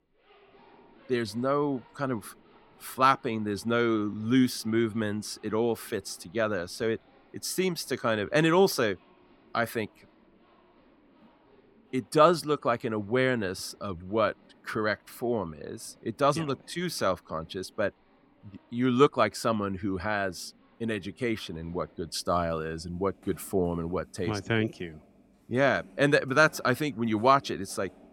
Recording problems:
household noises; faint; throughout; 30 dB below the speech

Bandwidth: 17 kHz